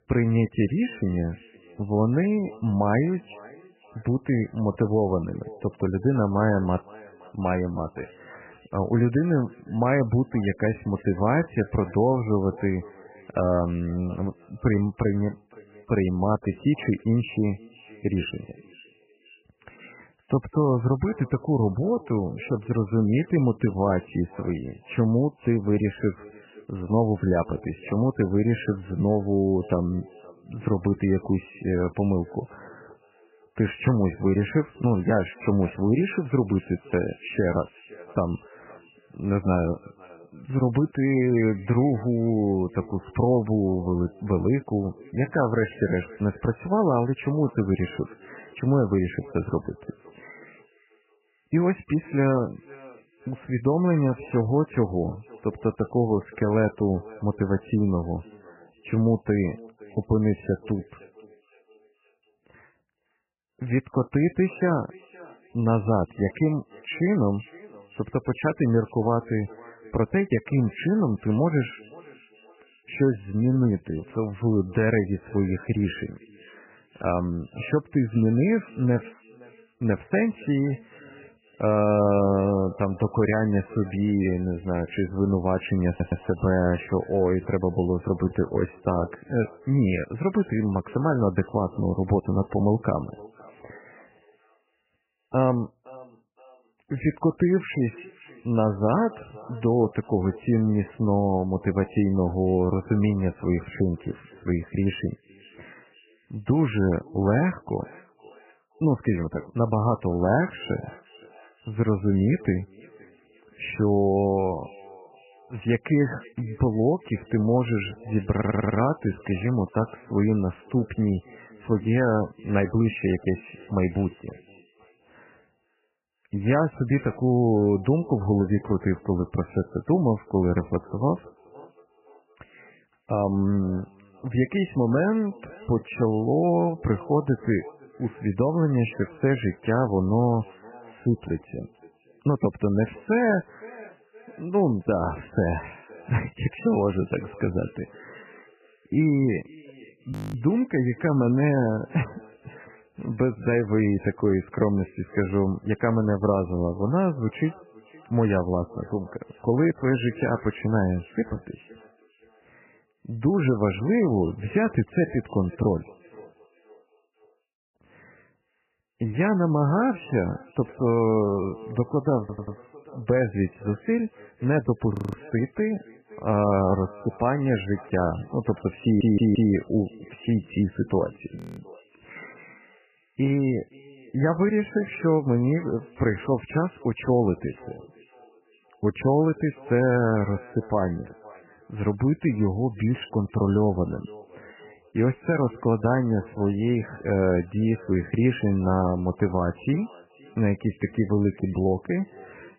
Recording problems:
garbled, watery; badly; nothing above 3 kHz
echo of what is said; faint; throughout; 520 ms later, 25 dB below the speech
audio stuttering; 4 times, first at 1:26
audio freezing; at 2:30, at 2:55 and at 3:01

